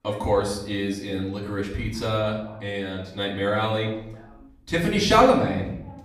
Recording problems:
off-mic speech; far
room echo; slight; dies away in 0.7 s
voice in the background; faint; throughout; 25 dB below the speech

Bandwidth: 14.5 kHz